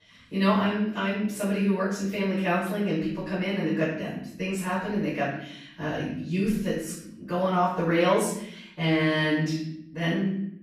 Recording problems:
off-mic speech; far
room echo; noticeable; dies away in 0.7 s

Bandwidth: 15 kHz